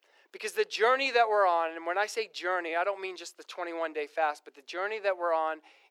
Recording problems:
thin; very; fading below 450 Hz

